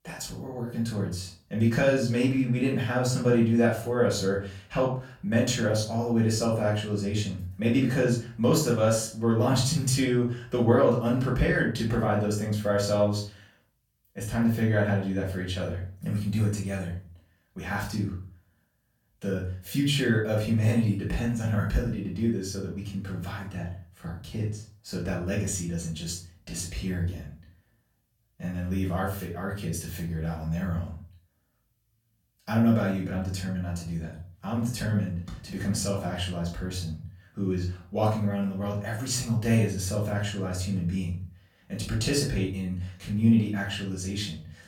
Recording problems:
off-mic speech; far
room echo; slight; dies away in 0.3 s

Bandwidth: 17 kHz